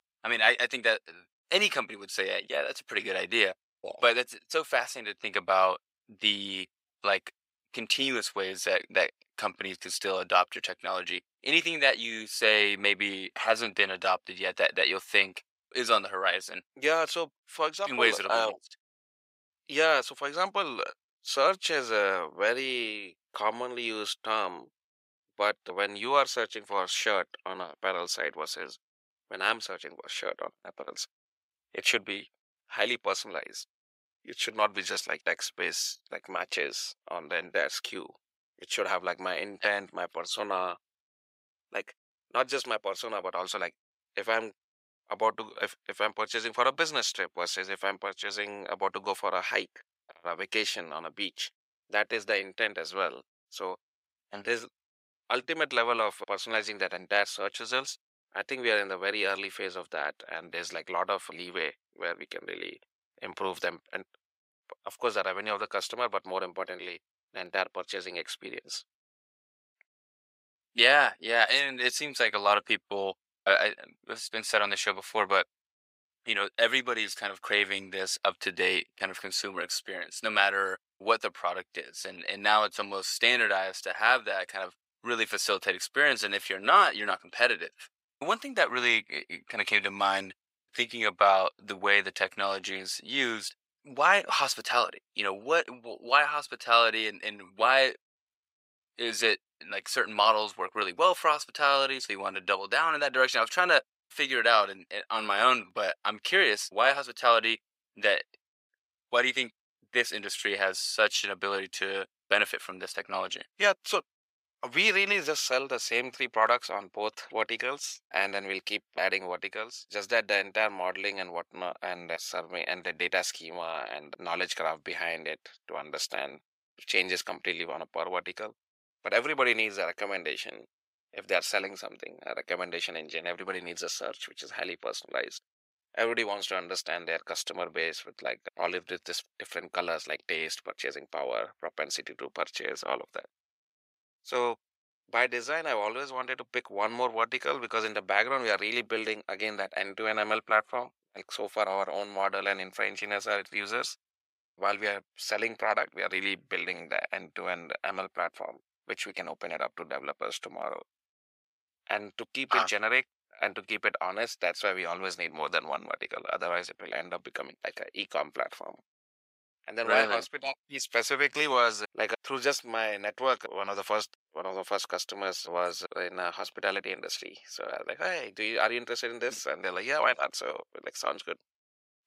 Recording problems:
thin; very; fading below 750 Hz

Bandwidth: 15.5 kHz